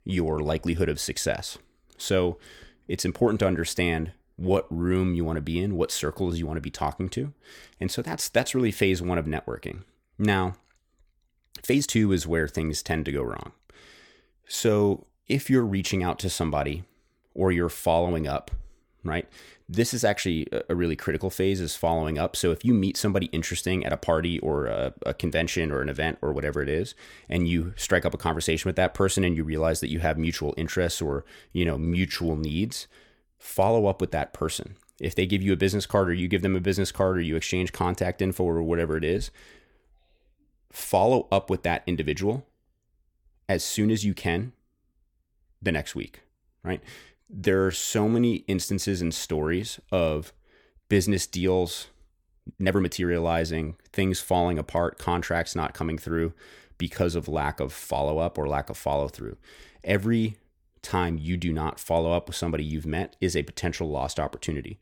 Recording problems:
uneven, jittery; strongly; from 4.5 to 53 s

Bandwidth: 18.5 kHz